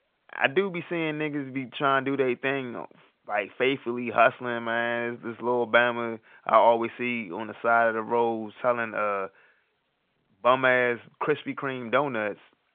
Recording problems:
phone-call audio; nothing above 3.5 kHz

